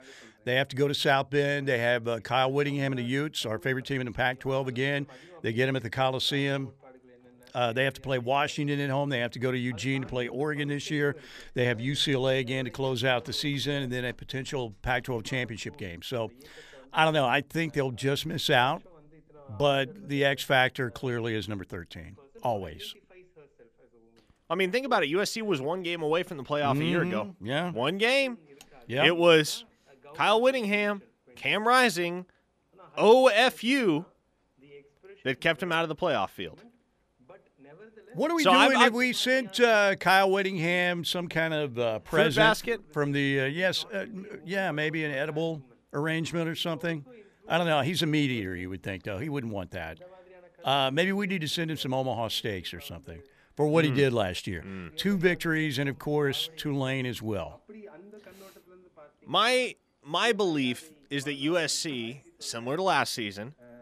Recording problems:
voice in the background; faint; throughout; 25 dB below the speech

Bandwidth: 14.5 kHz